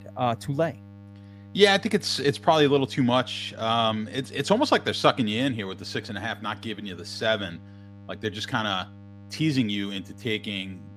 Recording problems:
electrical hum; faint; throughout; 50 Hz, 30 dB below the speech

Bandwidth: 15 kHz